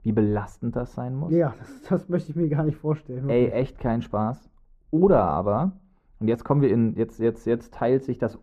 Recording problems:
muffled; very; fading above 2 kHz

